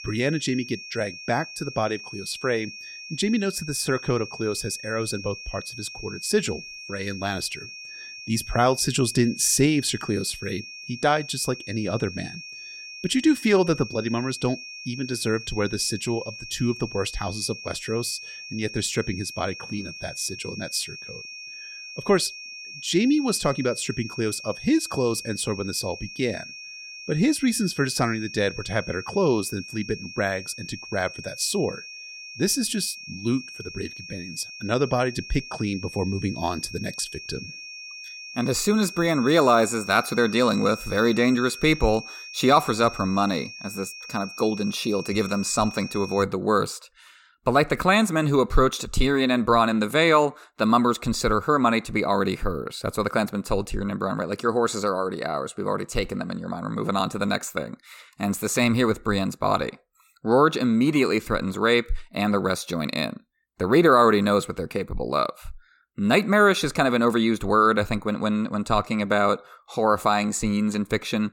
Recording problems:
high-pitched whine; noticeable; until 46 s; 2.5 kHz, 15 dB below the speech

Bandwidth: 17 kHz